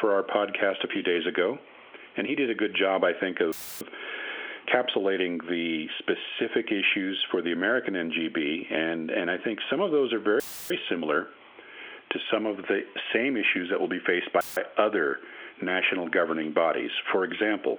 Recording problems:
squashed, flat; heavily
phone-call audio; nothing above 3.5 kHz
audio cutting out; filled with static; at 3.5 s, at 10 s and at 14 s

